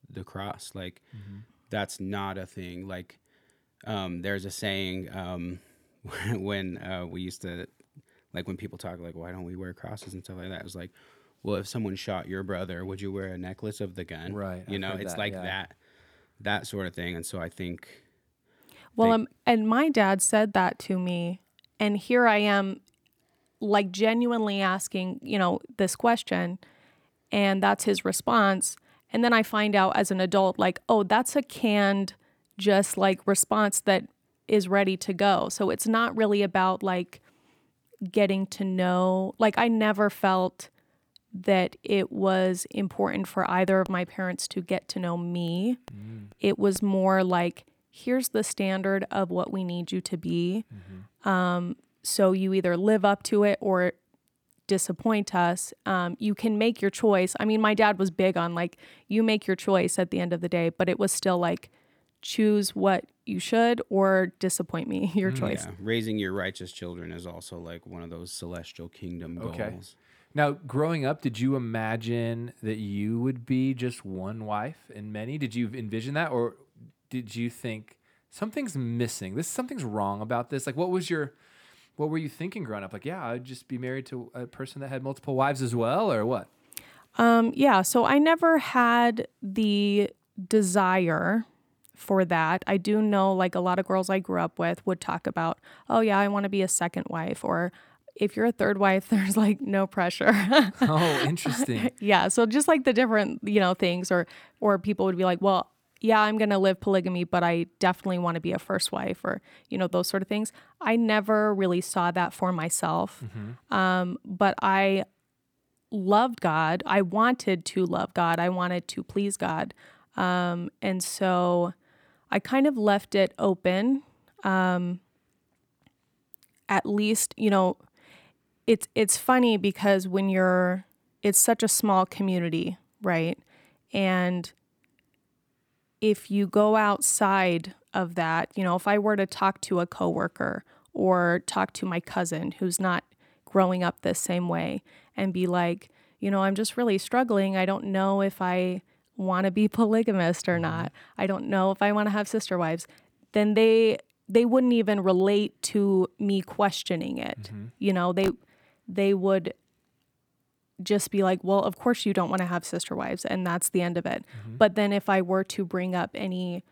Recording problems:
none

